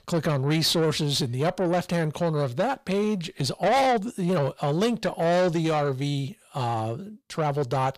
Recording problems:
distortion; heavy; 8 dB below the speech

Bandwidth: 15 kHz